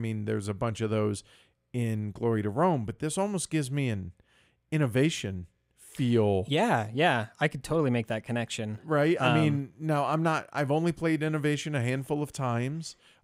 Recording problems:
abrupt cut into speech; at the start

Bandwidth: 15.5 kHz